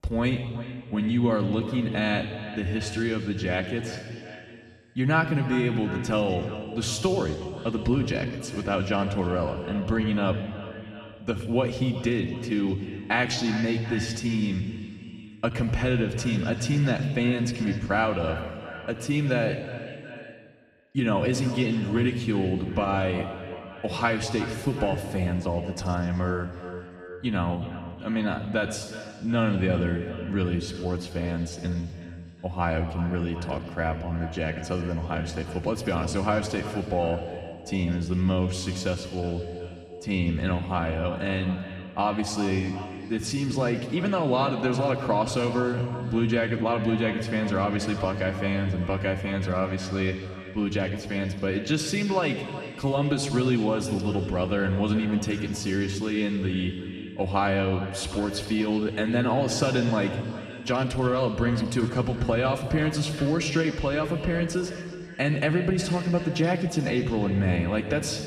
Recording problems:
echo of what is said; noticeable; throughout; 370 ms later, 15 dB below the speech
room echo; slight; dies away in 1.8 s
off-mic speech; somewhat distant

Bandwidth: 13.5 kHz